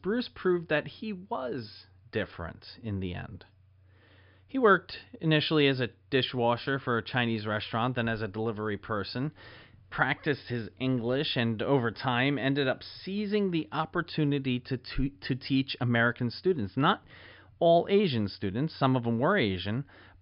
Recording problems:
high frequencies cut off; noticeable; nothing above 5.5 kHz

